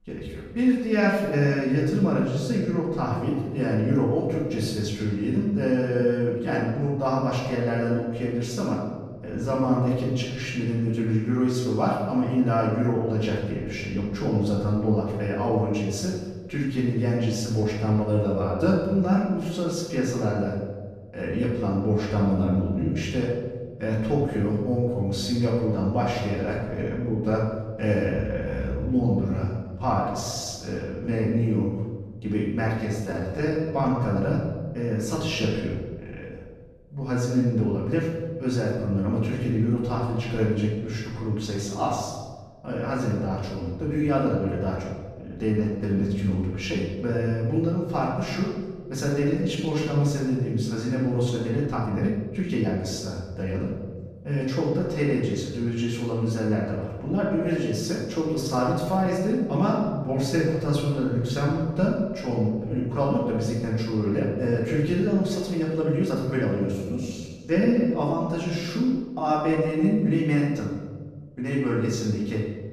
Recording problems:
off-mic speech; far
room echo; noticeable; dies away in 1.3 s
uneven, jittery; strongly; from 30 s to 1:10

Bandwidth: 14.5 kHz